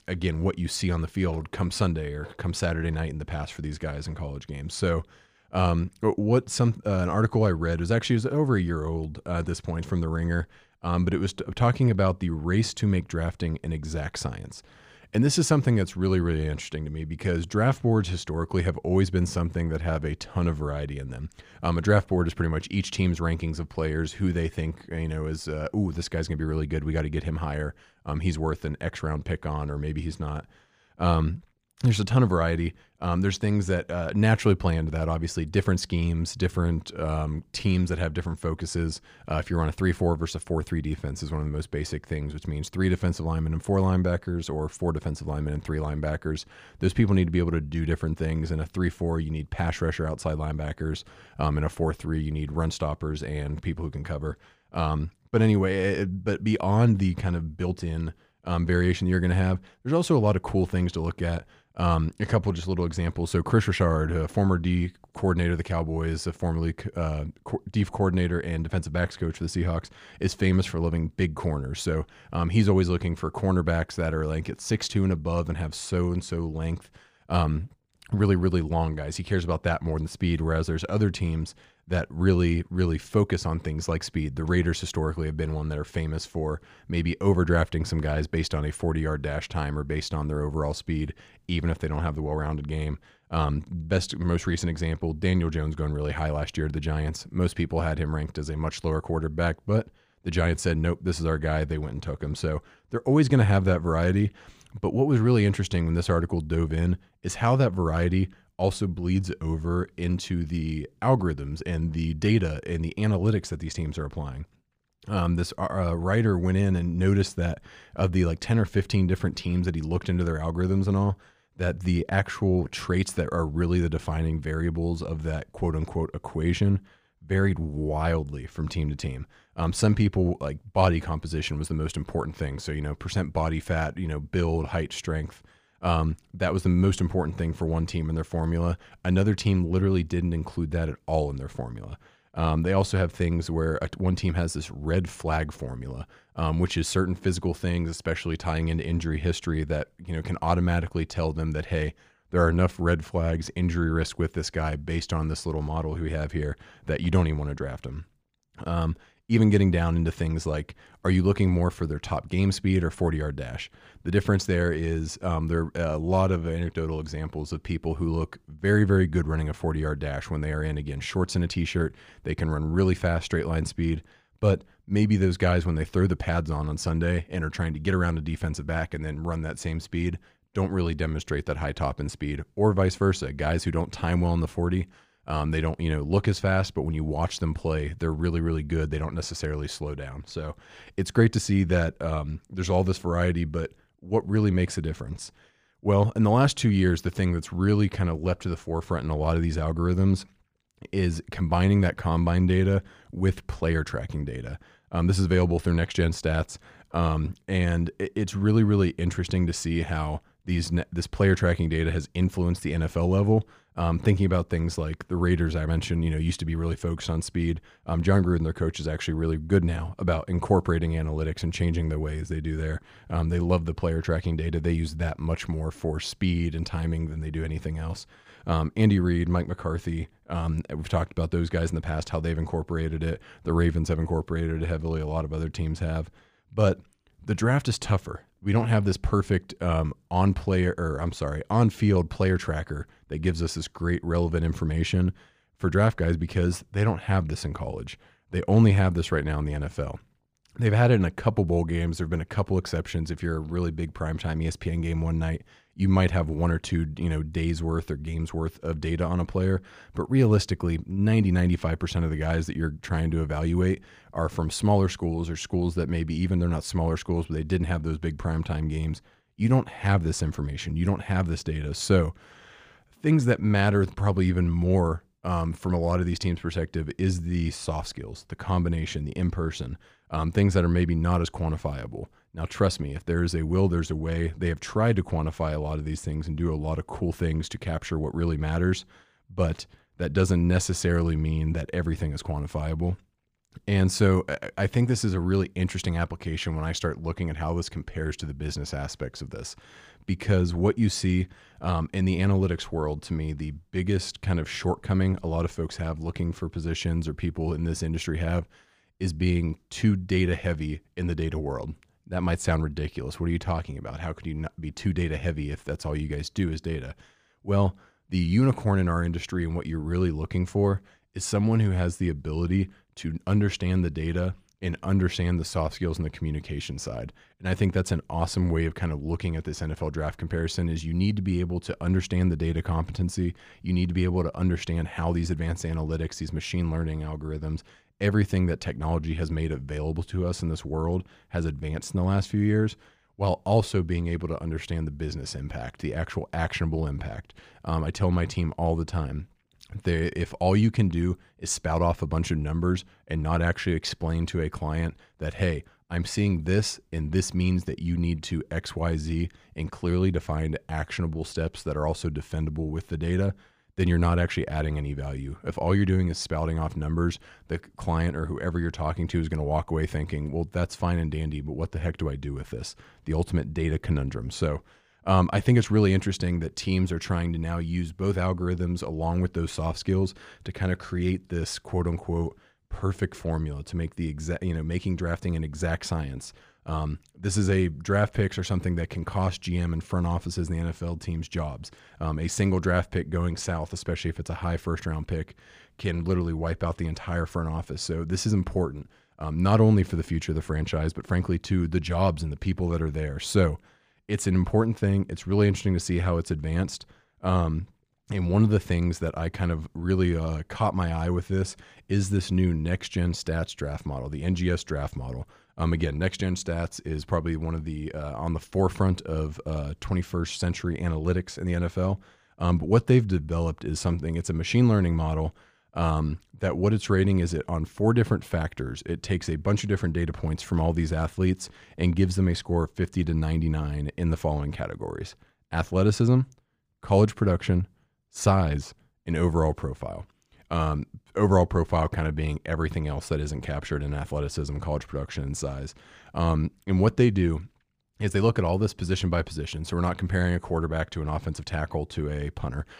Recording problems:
none

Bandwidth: 15 kHz